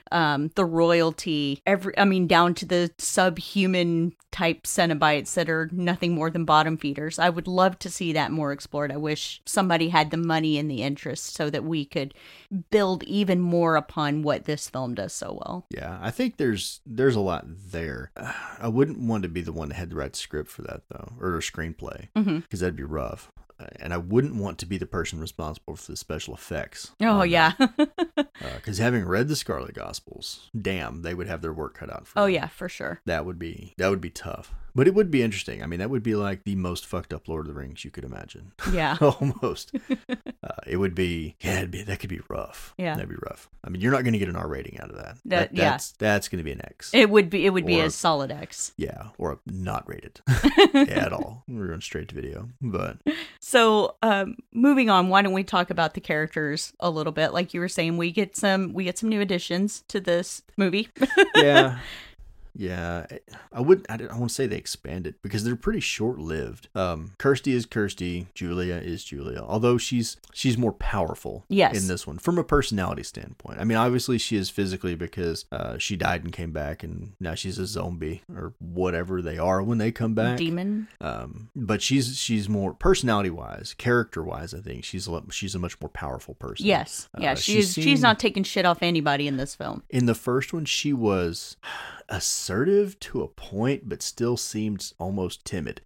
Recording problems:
none

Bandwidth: 16 kHz